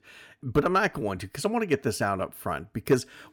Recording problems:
none

